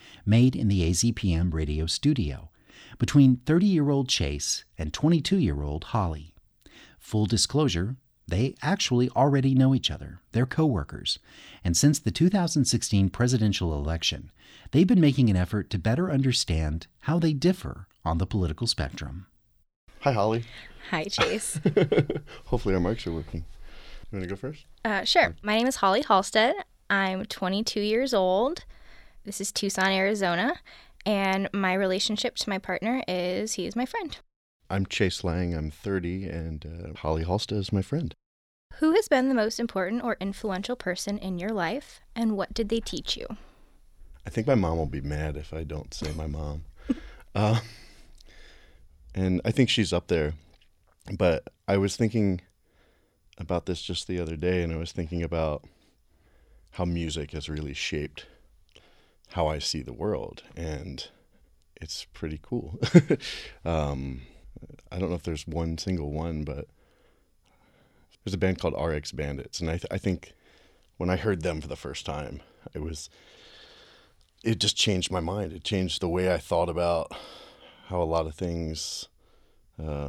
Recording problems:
abrupt cut into speech; at the end

